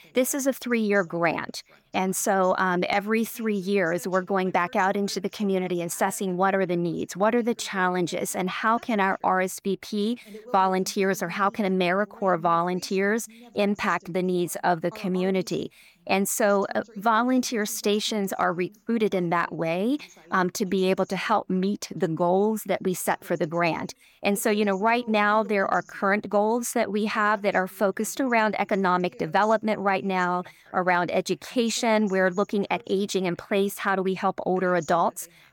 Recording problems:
voice in the background; faint; throughout; 25 dB below the speech

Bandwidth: 18 kHz